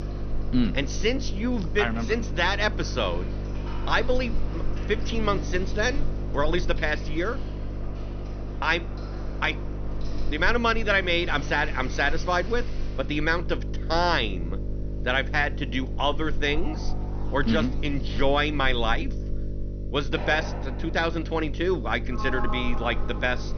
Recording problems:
high frequencies cut off; noticeable; nothing above 6 kHz
electrical hum; noticeable; throughout; 50 Hz, 15 dB below the speech
household noises; noticeable; throughout; 15 dB below the speech

